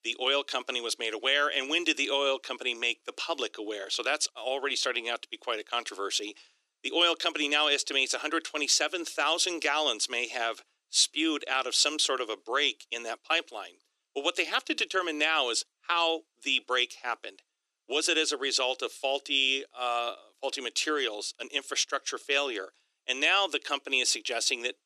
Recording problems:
thin; very; fading below 300 Hz

